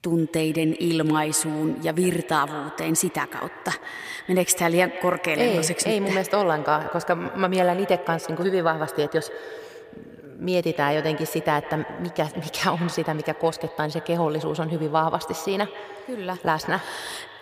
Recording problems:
echo of what is said; noticeable; throughout; 150 ms later, 15 dB below the speech

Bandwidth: 15 kHz